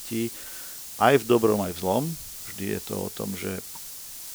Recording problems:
hiss; noticeable; throughout; 10 dB below the speech

